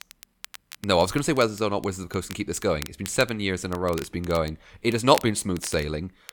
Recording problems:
crackle, like an old record; noticeable; 15 dB below the speech

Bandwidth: 18 kHz